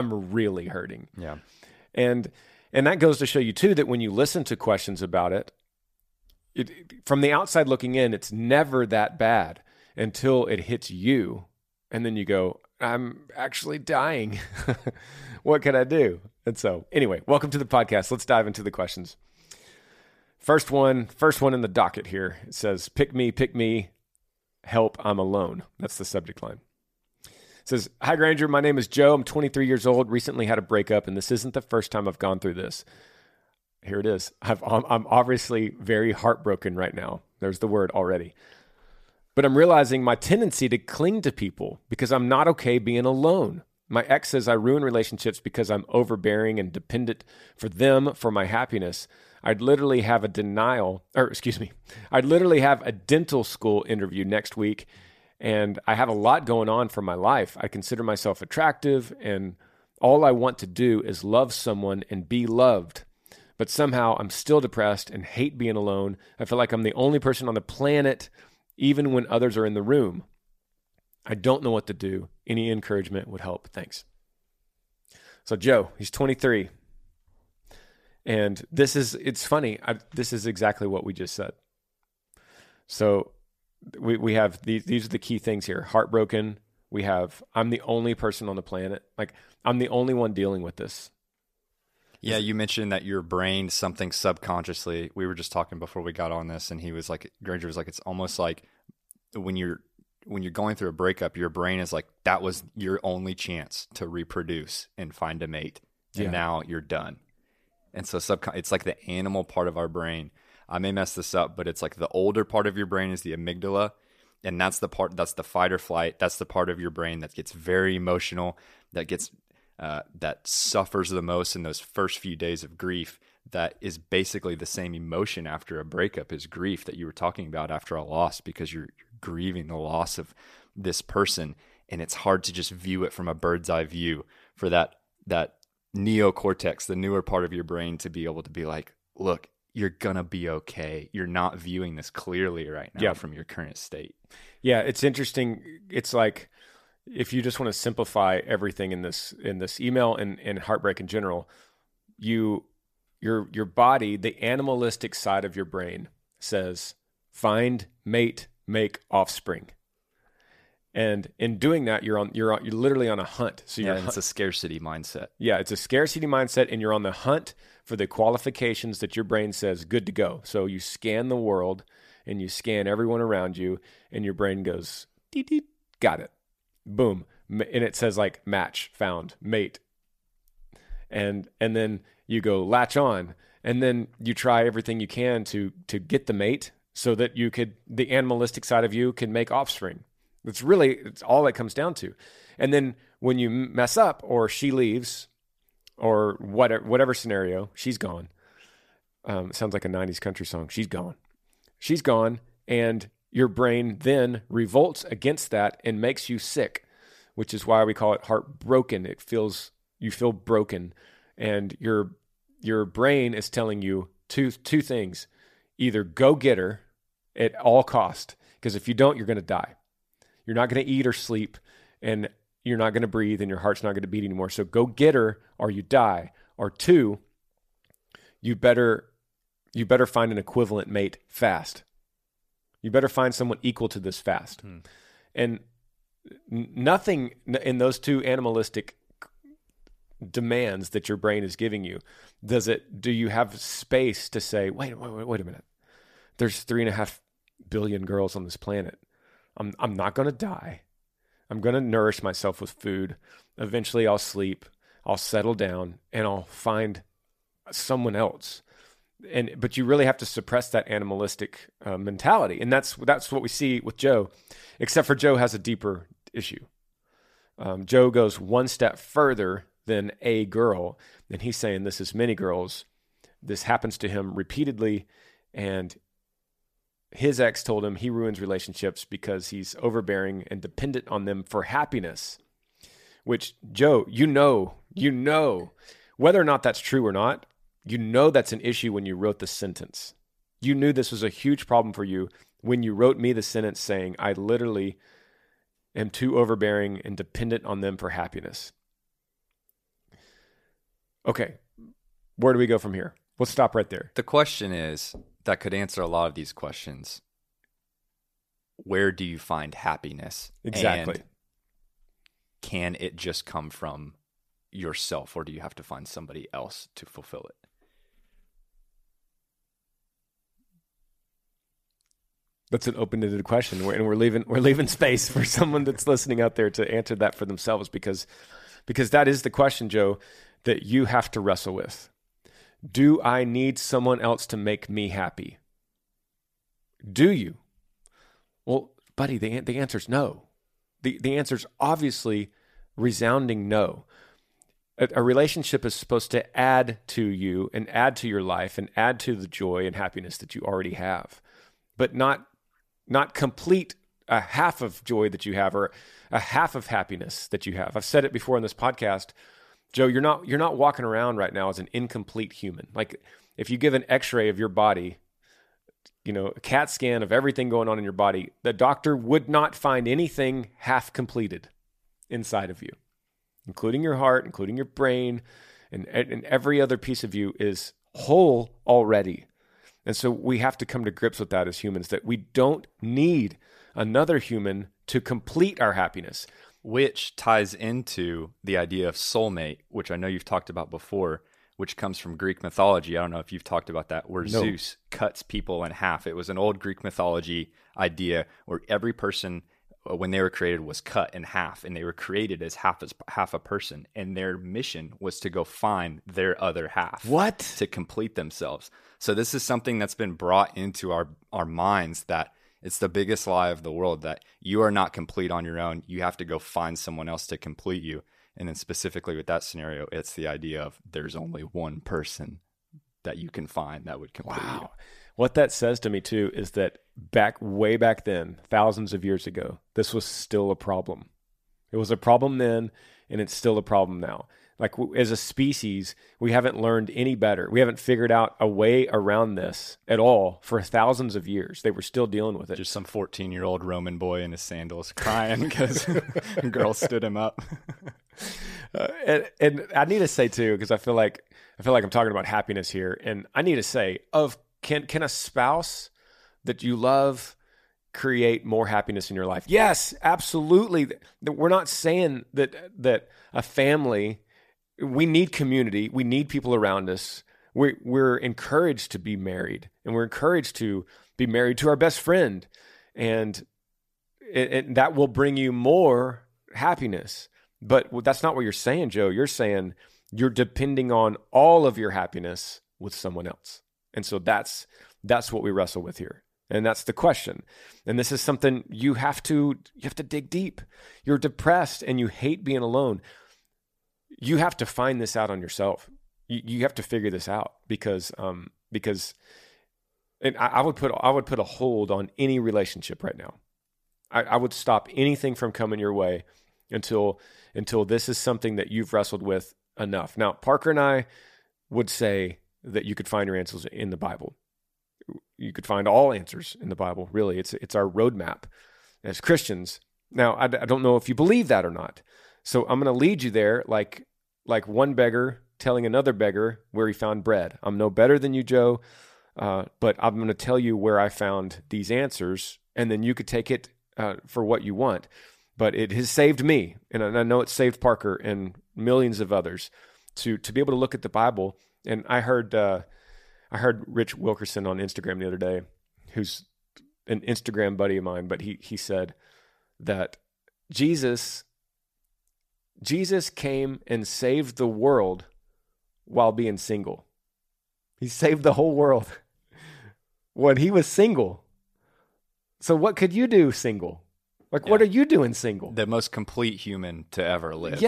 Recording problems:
abrupt cut into speech; at the start and the end

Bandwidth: 14.5 kHz